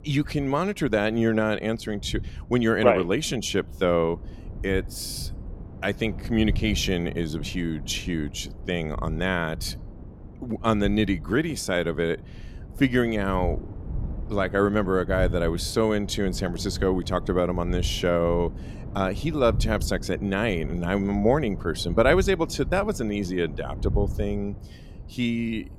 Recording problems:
wind noise on the microphone; occasional gusts; 20 dB below the speech

